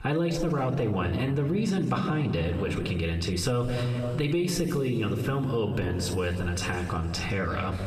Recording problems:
squashed, flat; heavily
room echo; noticeable; dies away in 1.7 s
off-mic speech; somewhat distant

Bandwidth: 14.5 kHz